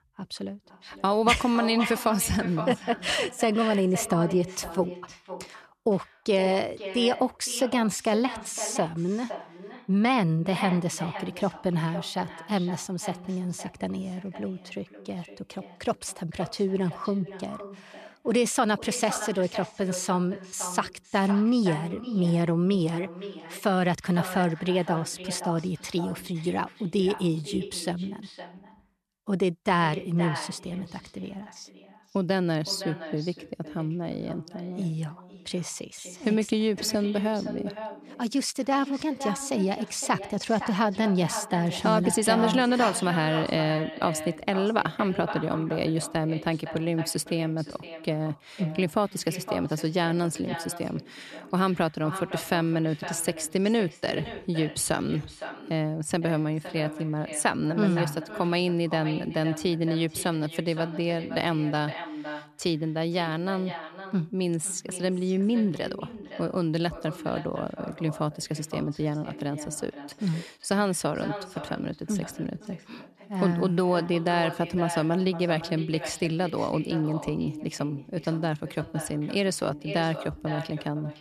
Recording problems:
echo of what is said; strong; throughout; 510 ms later, 10 dB below the speech

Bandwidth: 13.5 kHz